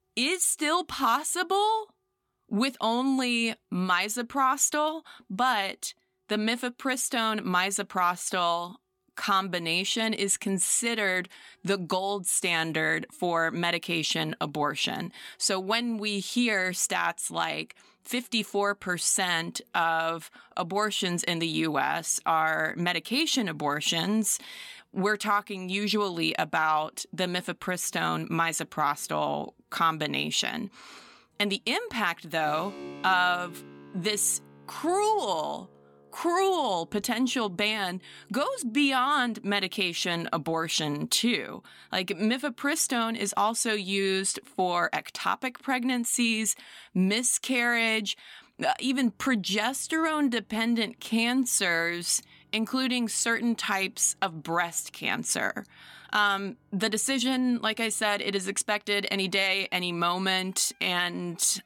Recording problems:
background music; faint; throughout; 30 dB below the speech

